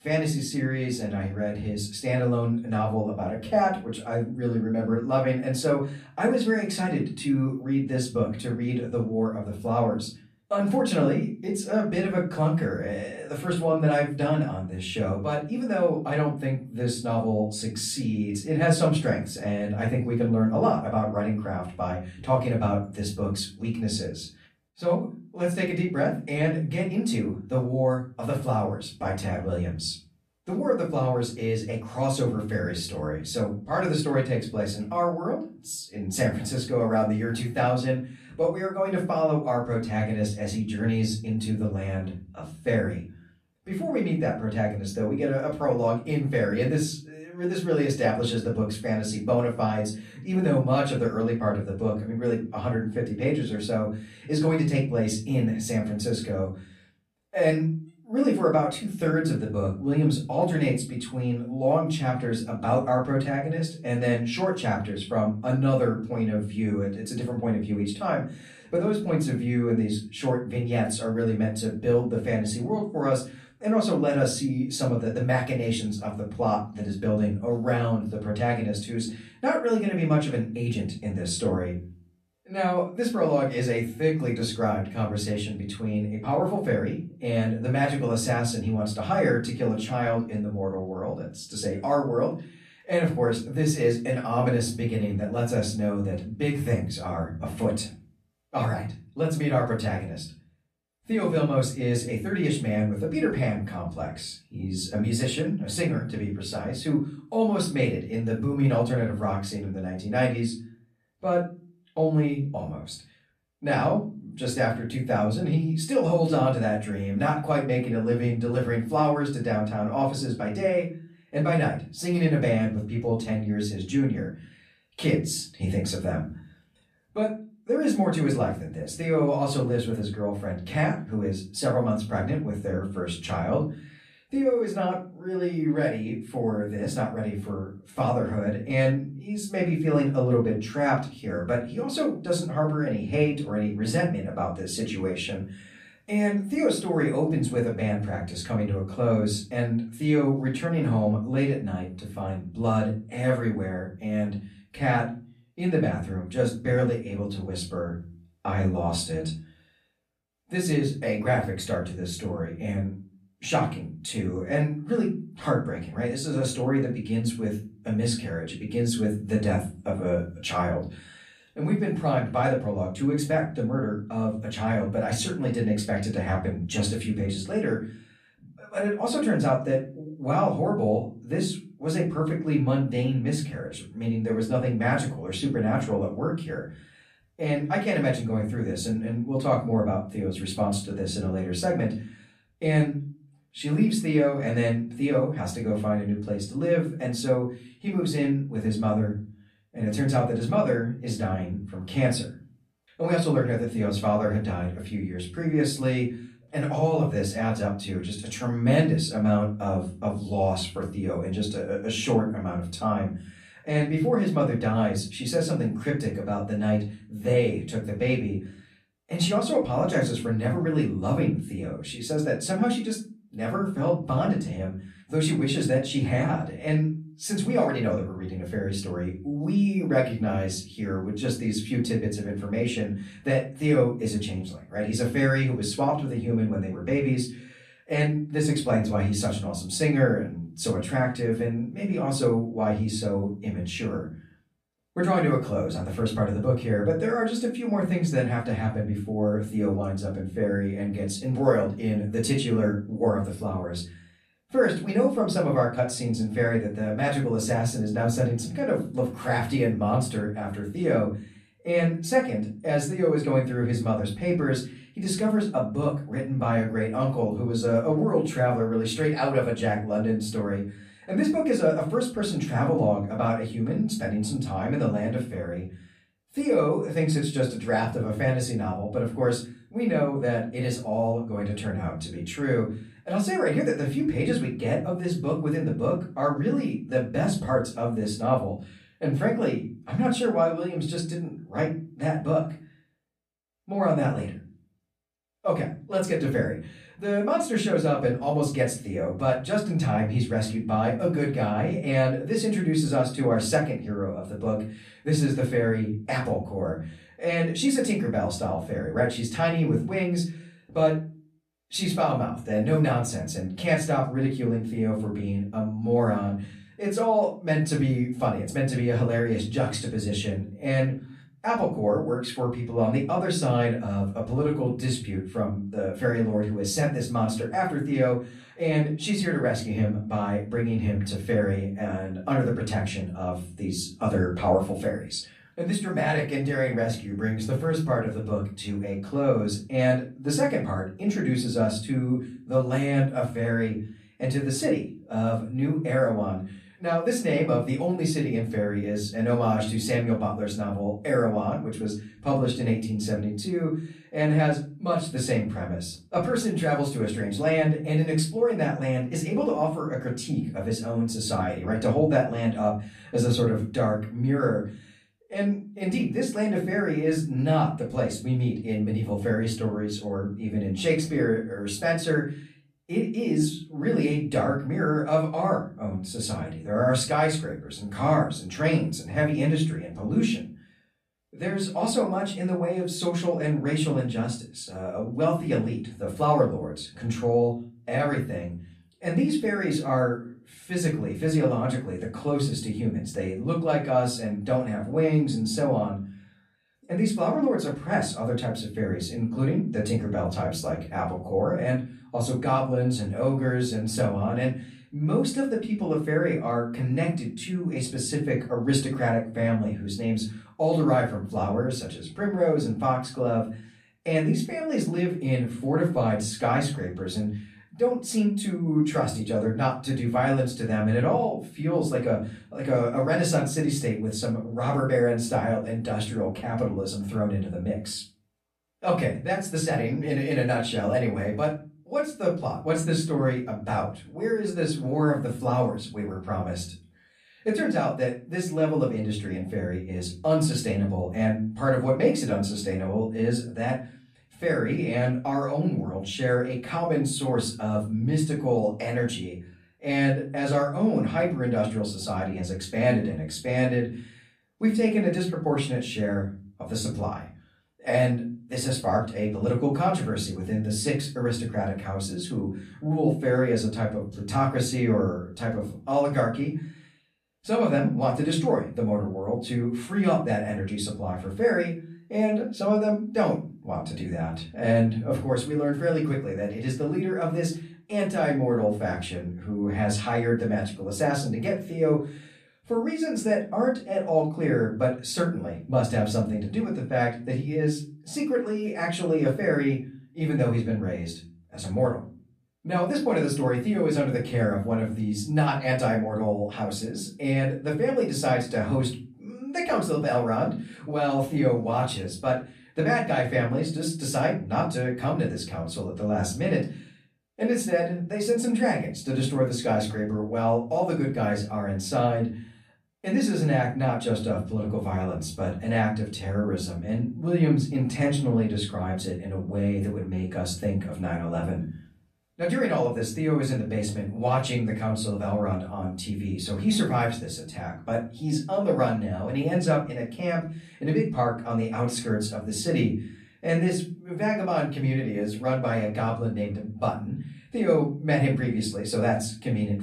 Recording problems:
off-mic speech; far
room echo; slight; dies away in 0.3 s

